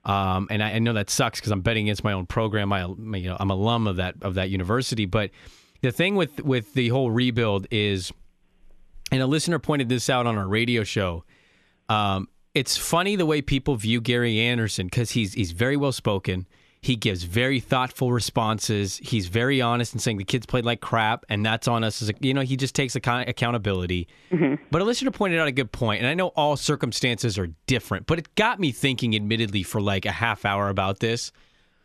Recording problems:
none

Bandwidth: 13.5 kHz